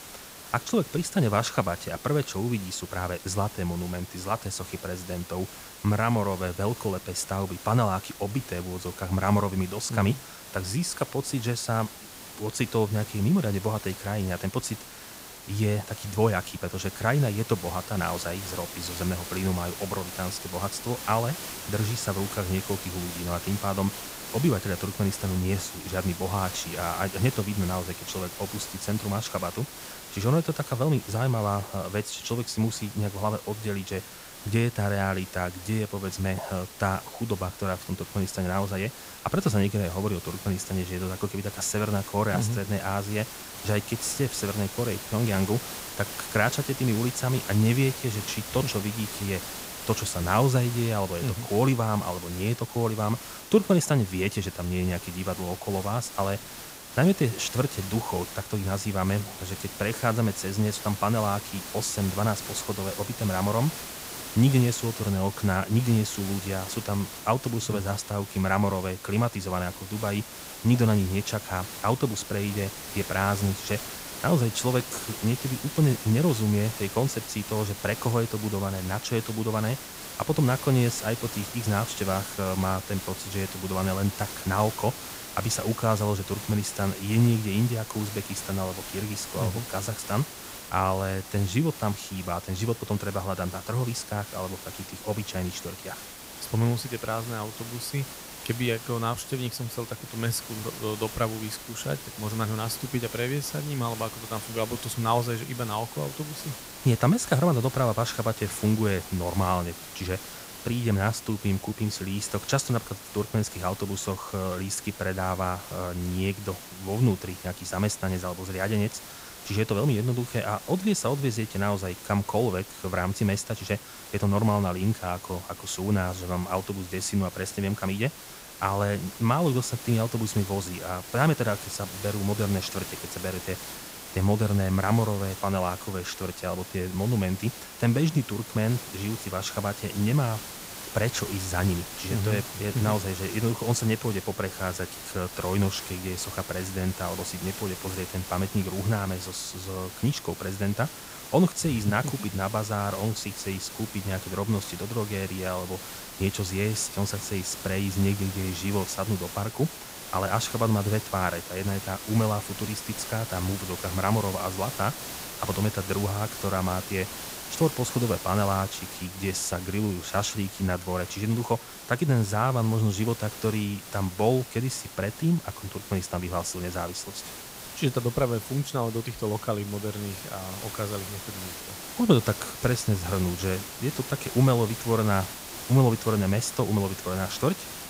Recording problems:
hiss; loud; throughout; 10 dB below the speech

